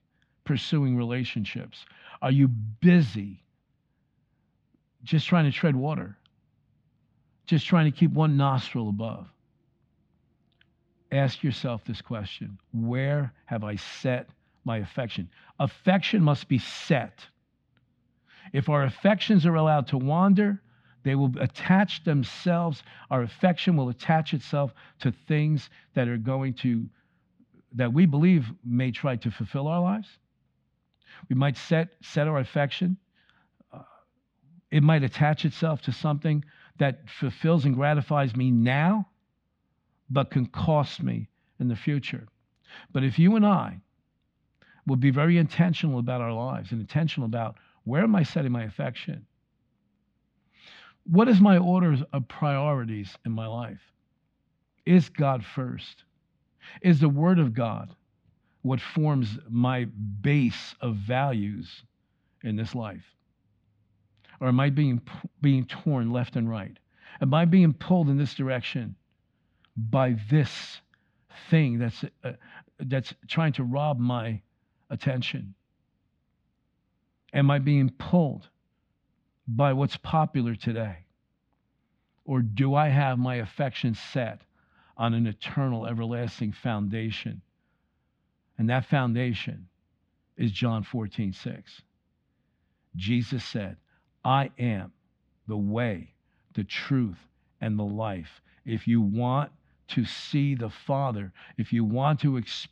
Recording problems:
muffled; slightly; fading above 3.5 kHz

